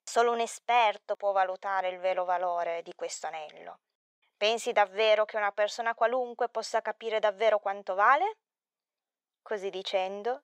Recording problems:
thin; very; fading below 400 Hz

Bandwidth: 15.5 kHz